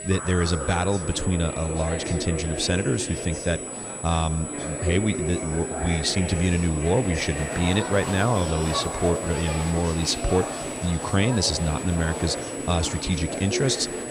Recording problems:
high-pitched whine; loud; throughout; 8 kHz, 10 dB below the speech
chatter from many people; loud; throughout; 6 dB below the speech

